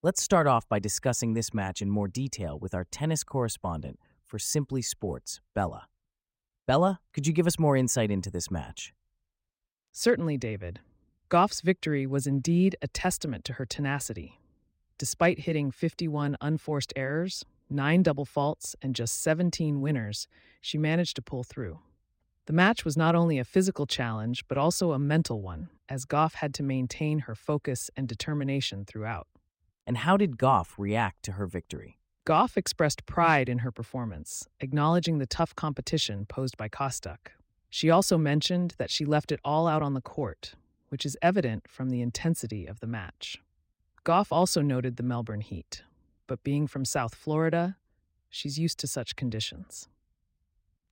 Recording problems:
none

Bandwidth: 16 kHz